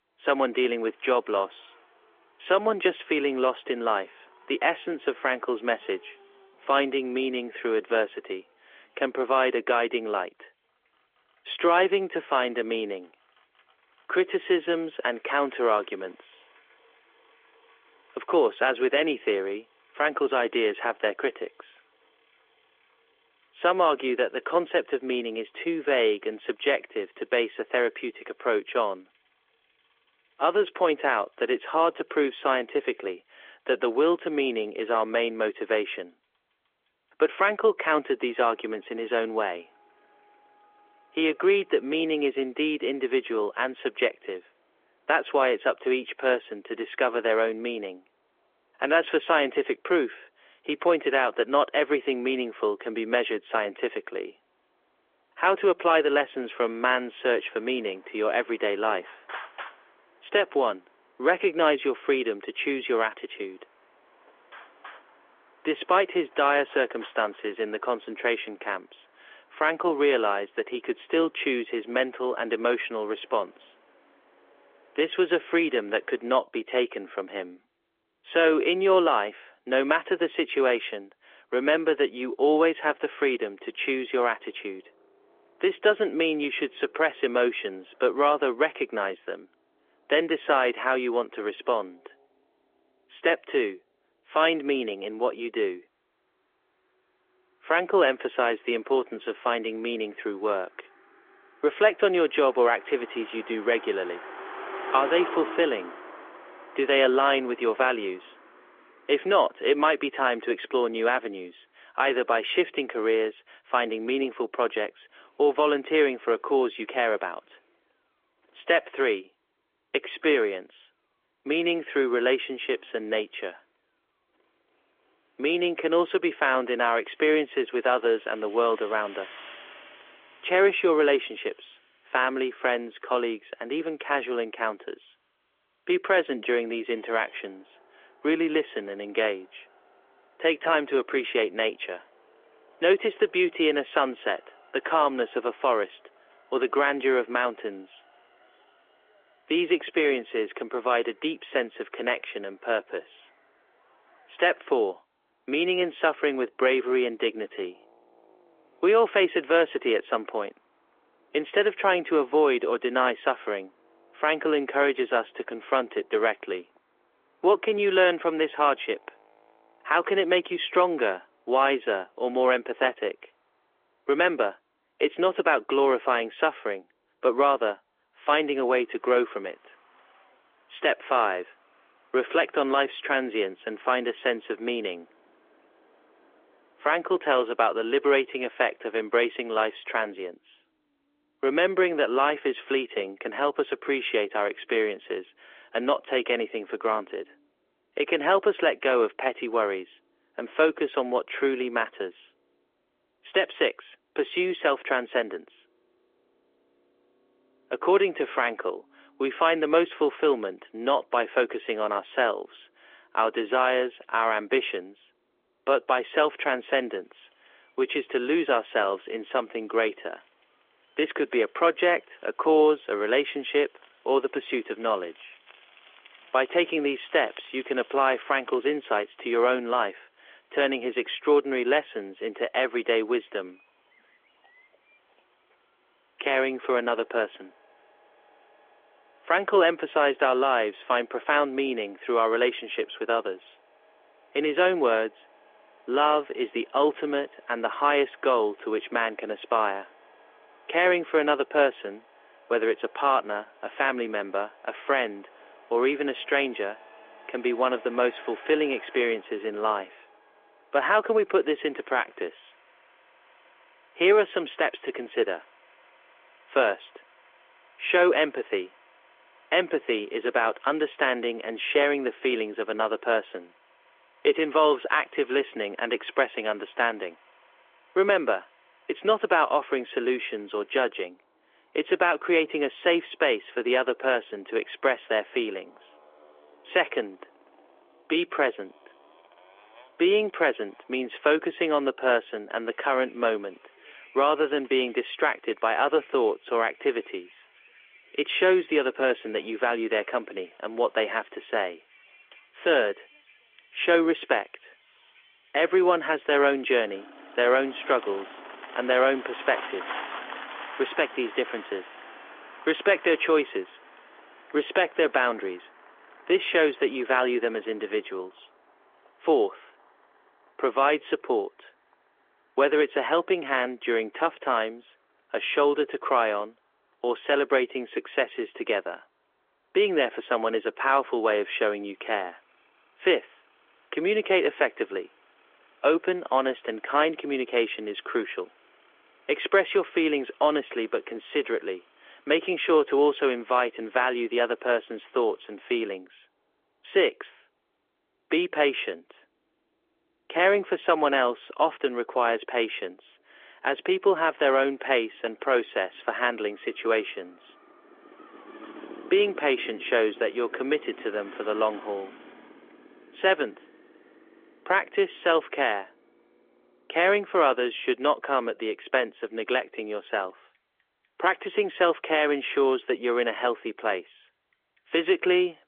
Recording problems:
phone-call audio; nothing above 3.5 kHz
traffic noise; faint; throughout; 25 dB below the speech

